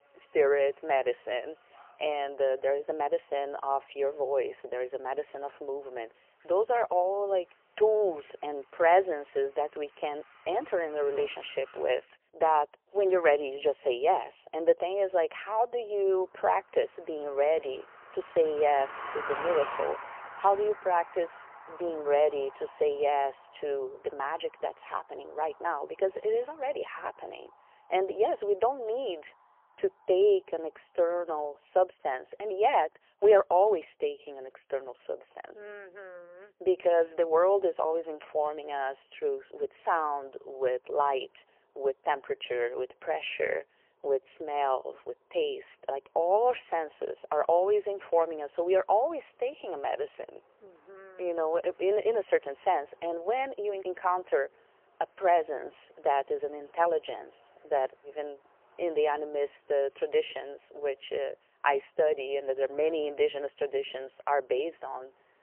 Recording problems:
phone-call audio; poor line; nothing above 3 kHz
traffic noise; noticeable; throughout; 15 dB below the speech

